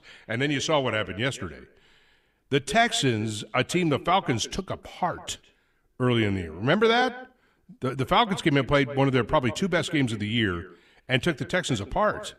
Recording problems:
echo of what is said; noticeable; throughout; 150 ms later, 15 dB below the speech

